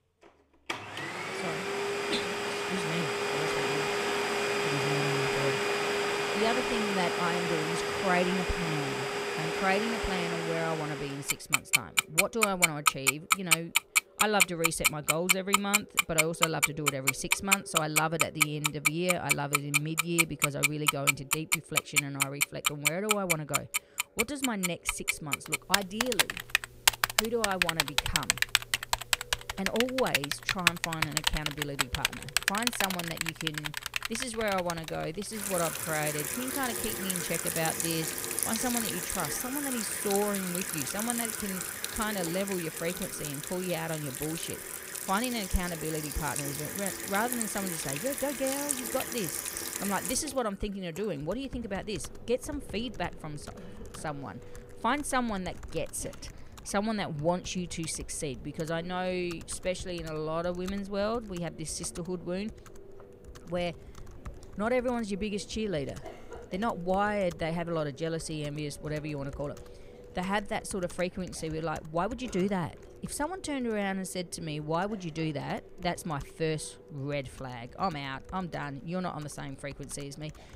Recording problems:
echo of what is said; faint; throughout; 560 ms later, 20 dB below the speech
household noises; very loud; throughout; 4 dB above the speech

